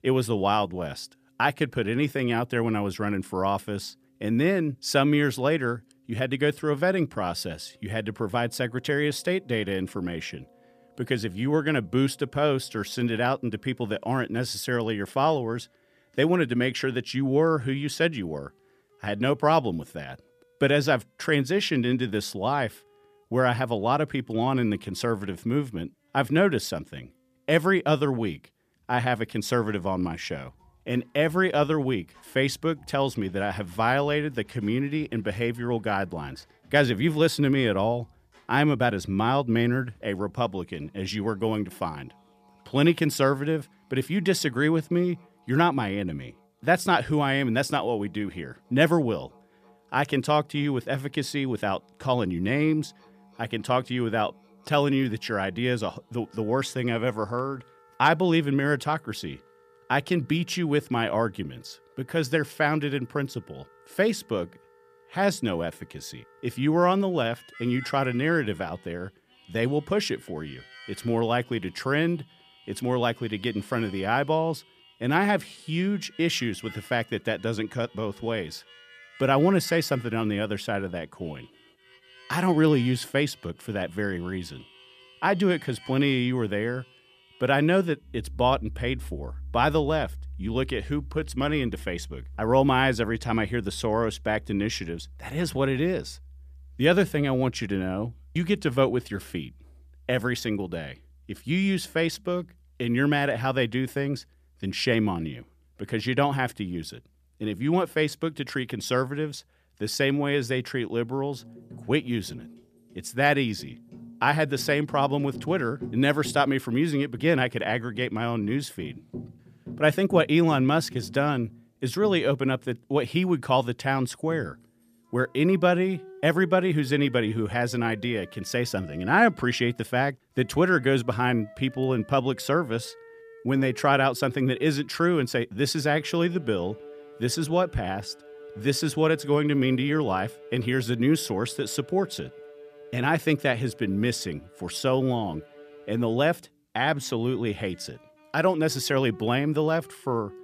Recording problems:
background music; faint; throughout; 20 dB below the speech

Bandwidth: 14.5 kHz